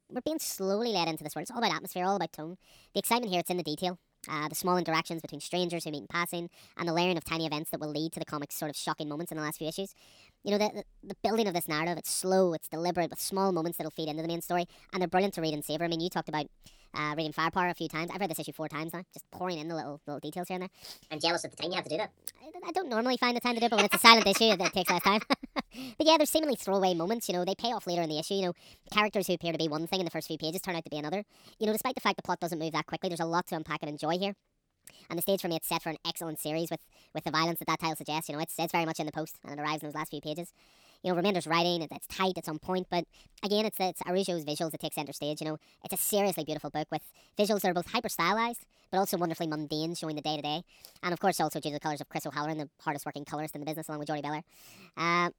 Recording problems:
wrong speed and pitch; too fast and too high; 1.5 times normal speed

